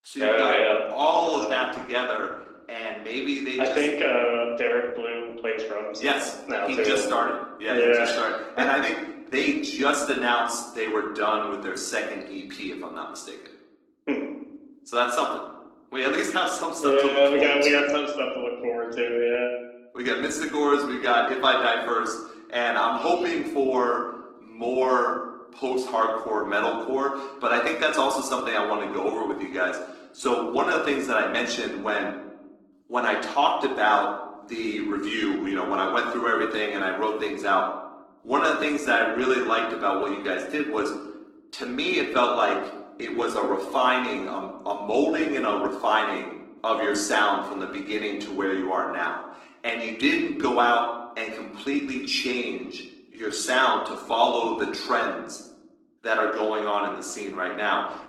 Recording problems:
room echo; slight; dies away in 0.7 s
off-mic speech; somewhat distant
garbled, watery; slightly; nothing above 17.5 kHz
thin; very slightly; fading below 250 Hz

